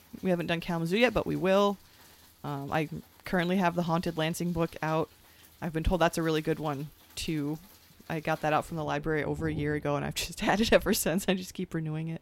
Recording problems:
rain or running water; faint; throughout; 20 dB below the speech

